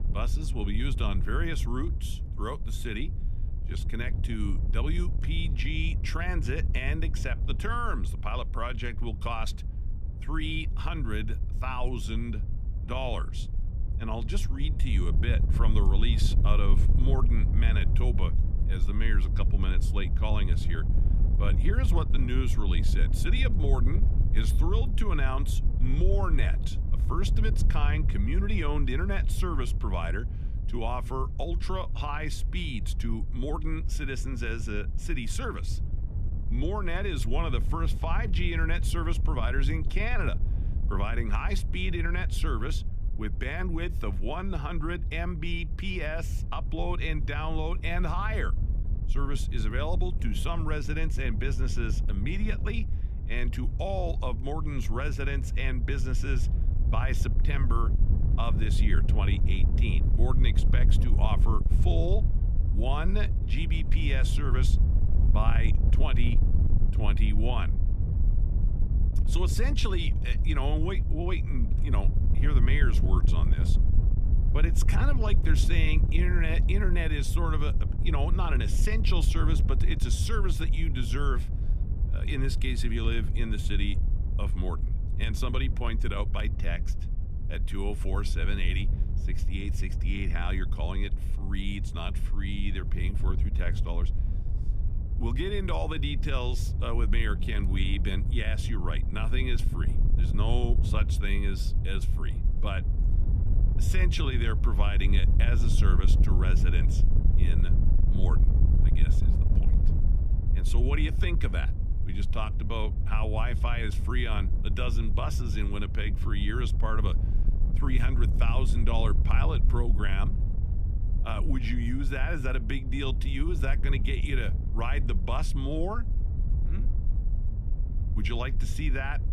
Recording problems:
wind noise on the microphone; heavy; 10 dB below the speech

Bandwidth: 14.5 kHz